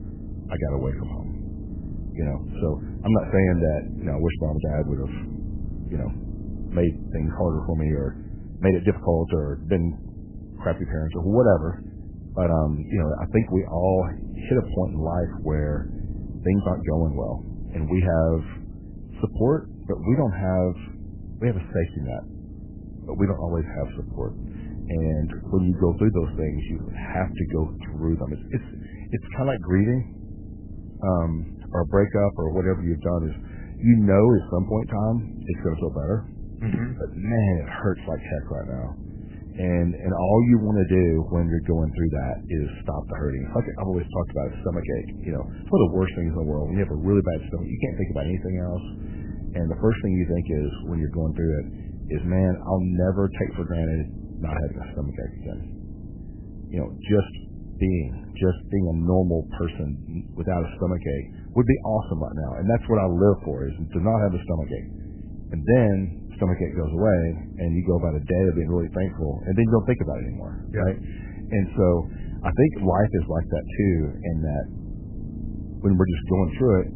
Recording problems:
garbled, watery; badly; nothing above 3 kHz
low rumble; noticeable; throughout; 20 dB below the speech
uneven, jittery; strongly; from 8.5 s to 1:12

